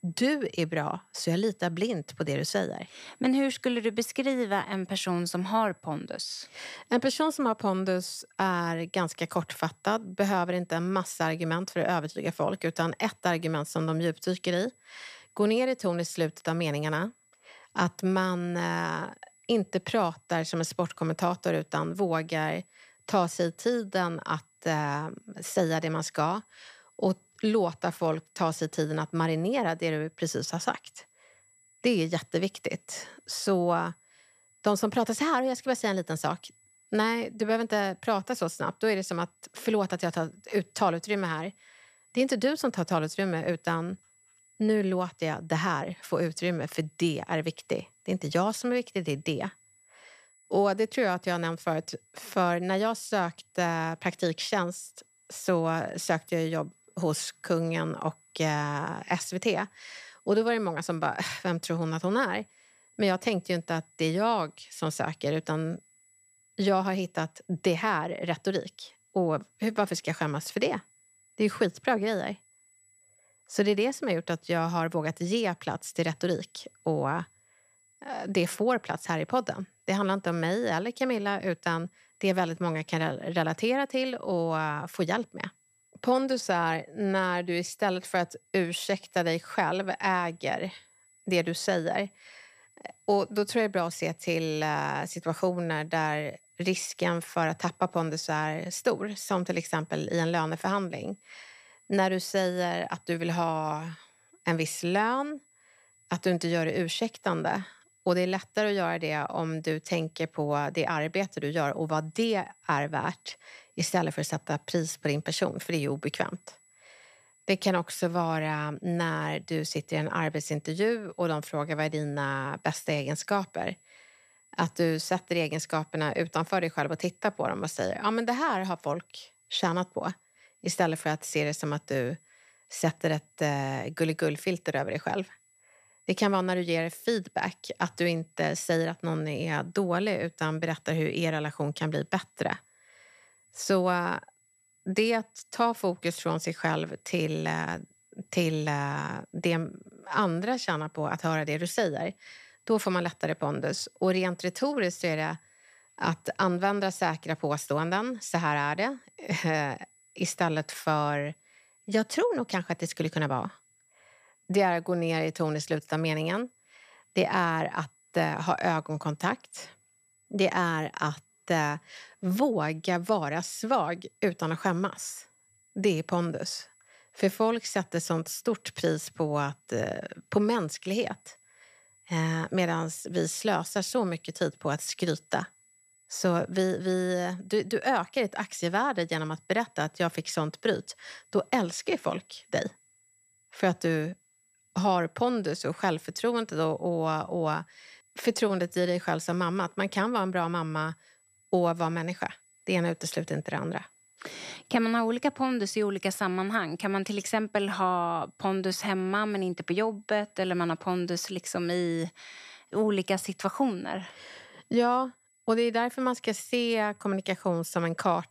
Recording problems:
high-pitched whine; faint; throughout; 8 kHz, 35 dB below the speech

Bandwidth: 14.5 kHz